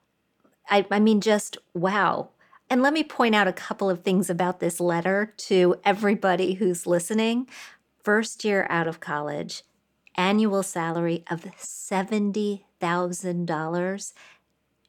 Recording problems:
none

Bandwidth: 18 kHz